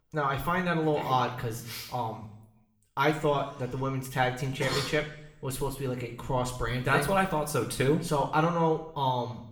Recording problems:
room echo; slight; dies away in 0.6 s
off-mic speech; somewhat distant

